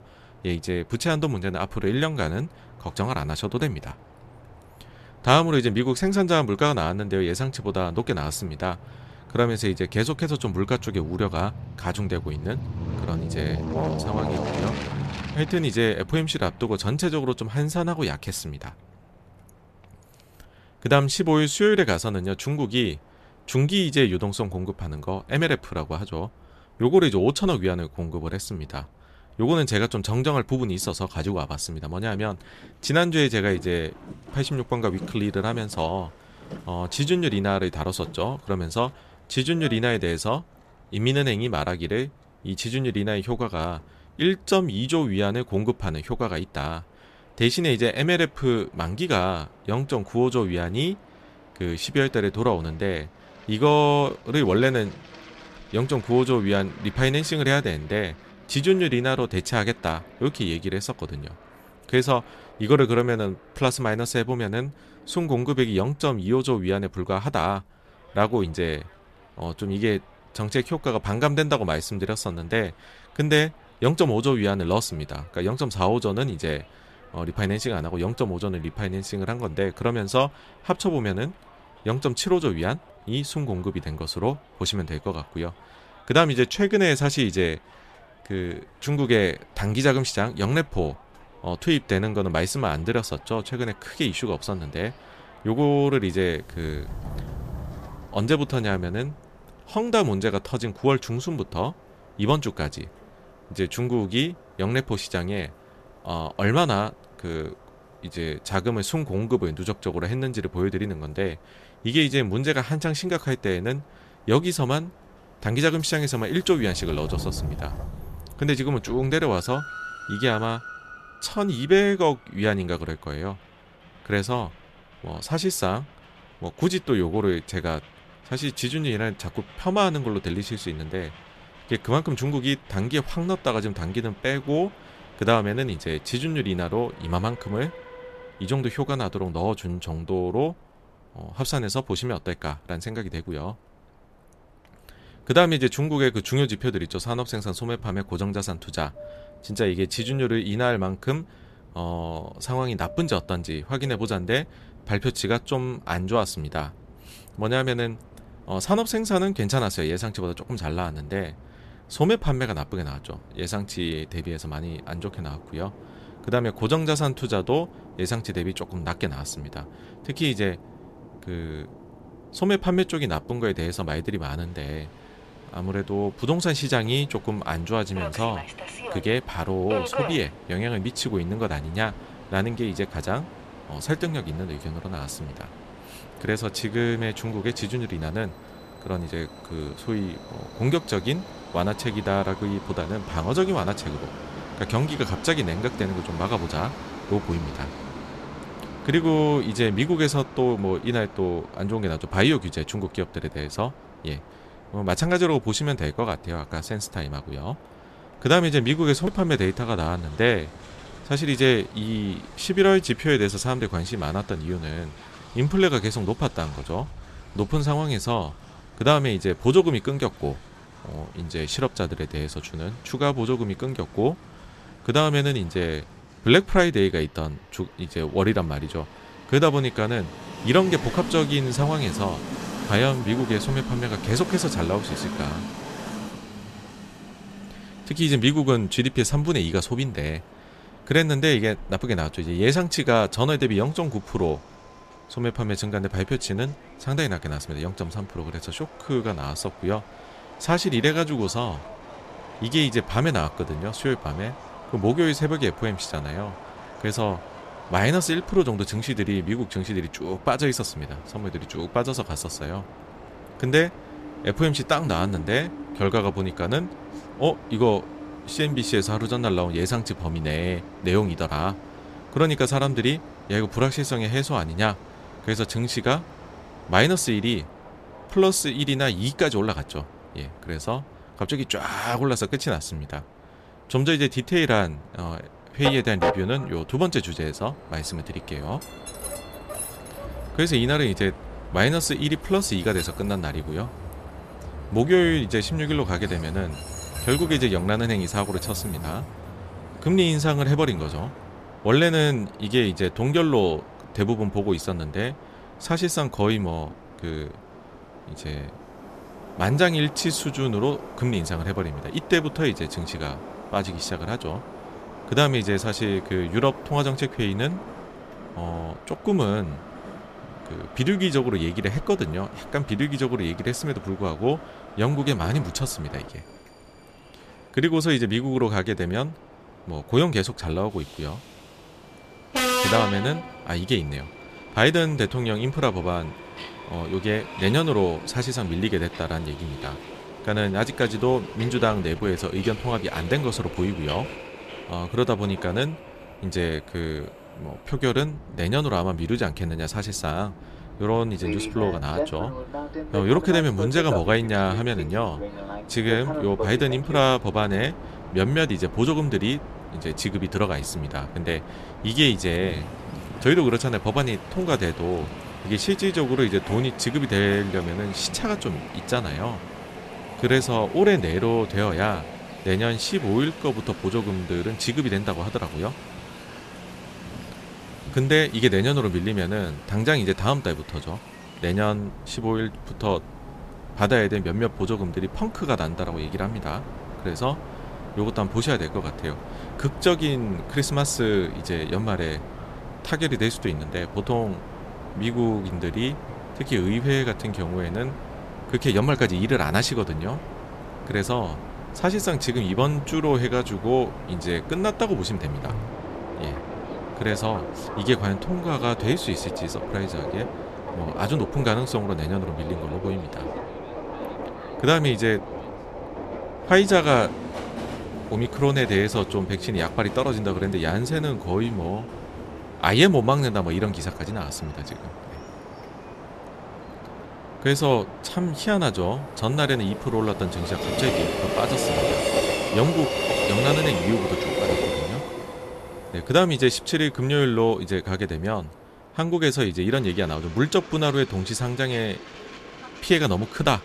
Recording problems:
train or aircraft noise; noticeable; throughout; 10 dB below the speech

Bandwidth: 14.5 kHz